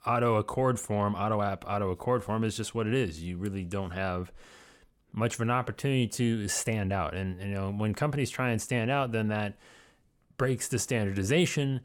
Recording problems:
none

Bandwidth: 17.5 kHz